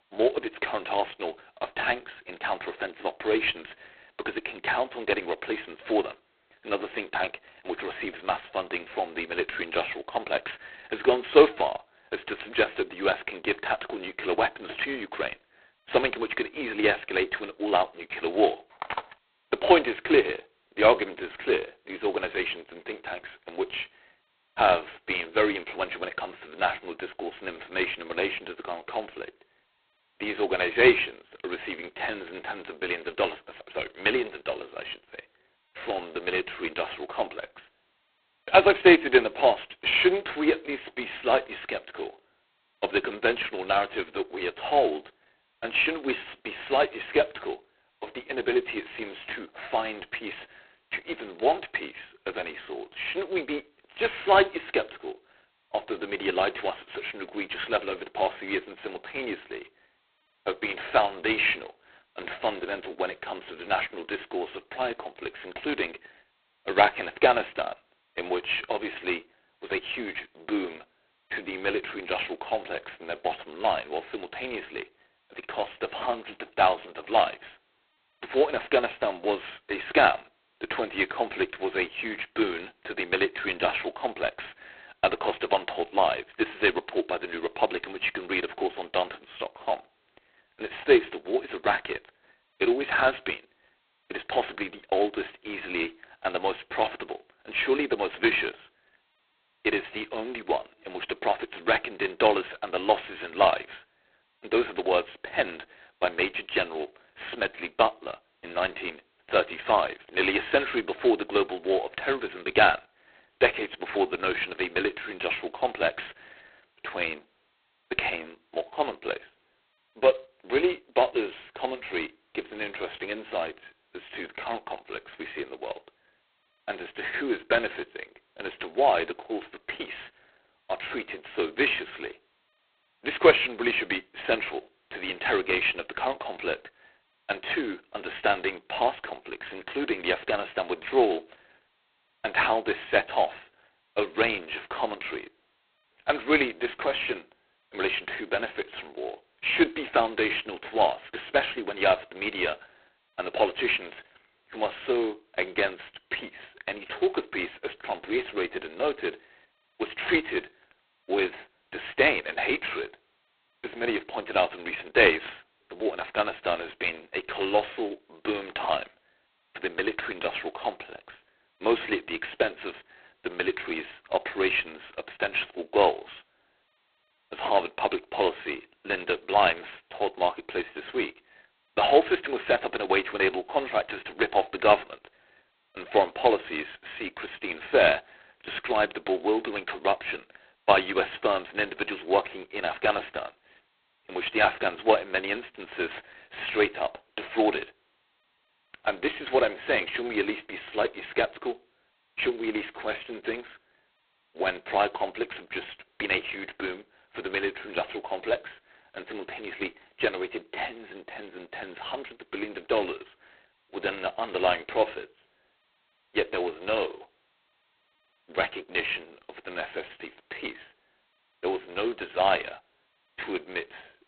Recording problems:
phone-call audio; poor line; nothing above 4 kHz
phone ringing; noticeable; at 19 s; peak 7 dB below the speech

